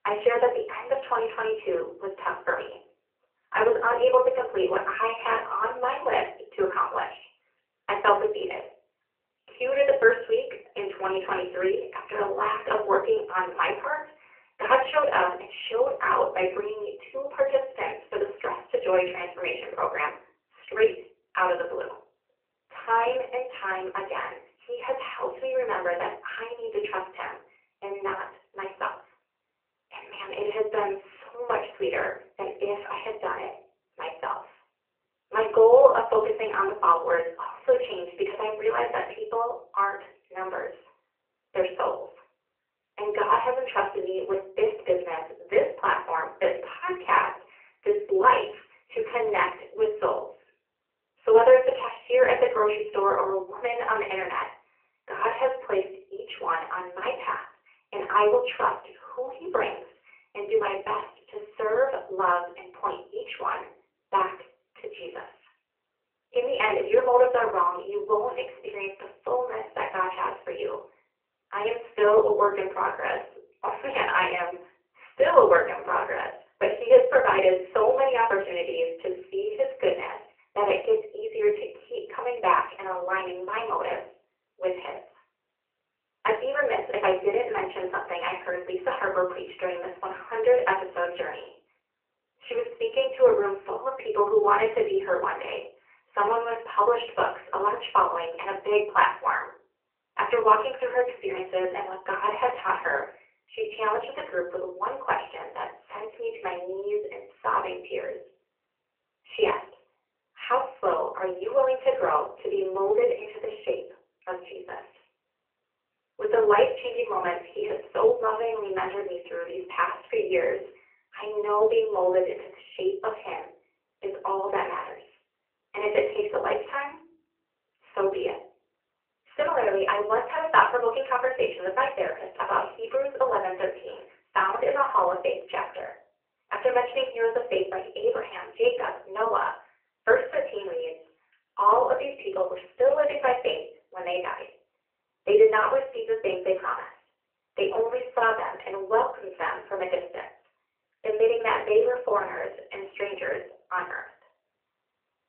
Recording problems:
off-mic speech; far
room echo; slight; dies away in 0.4 s
phone-call audio; nothing above 3 kHz

